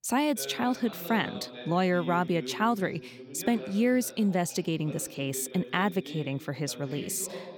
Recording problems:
voice in the background; noticeable; throughout; 15 dB below the speech

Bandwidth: 18 kHz